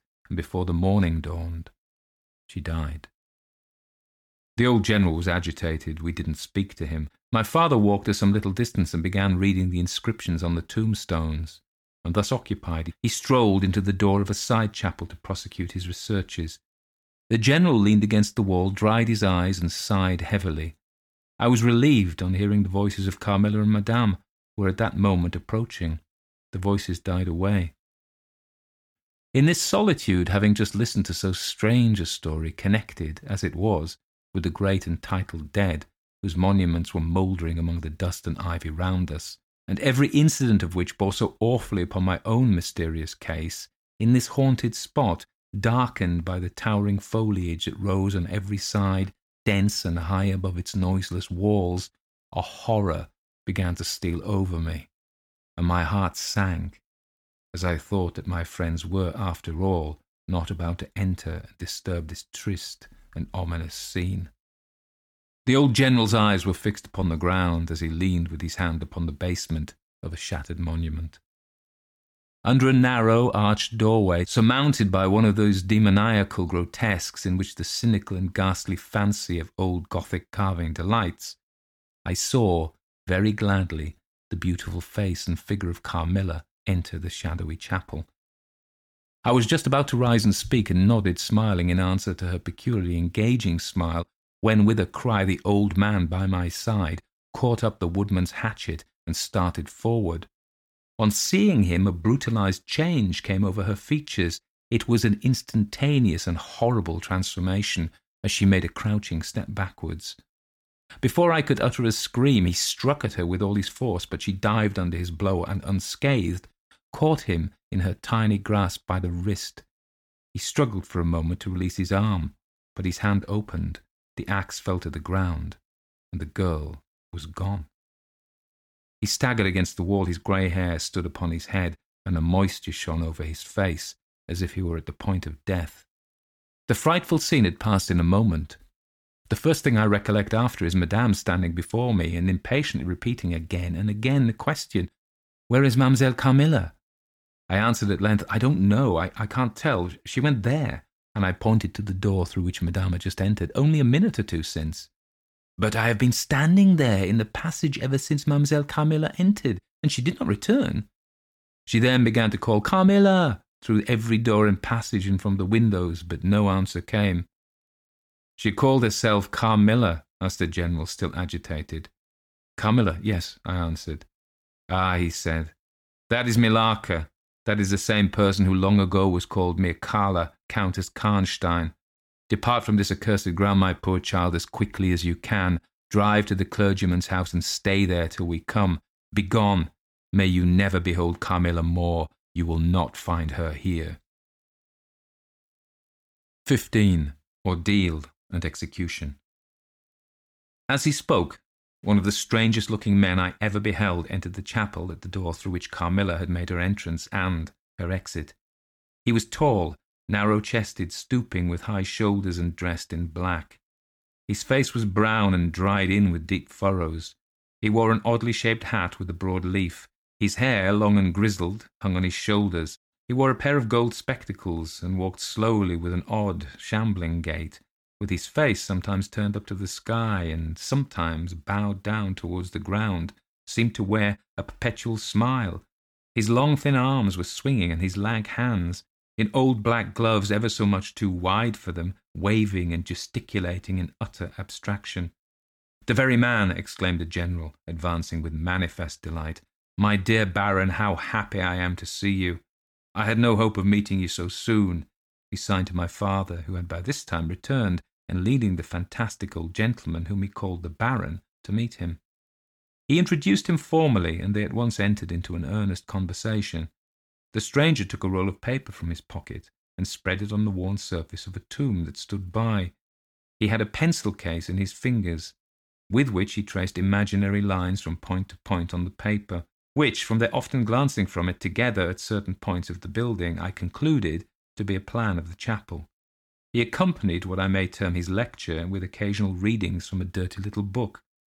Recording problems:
none

